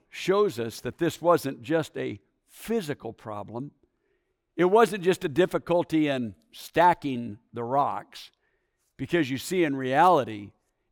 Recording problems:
none

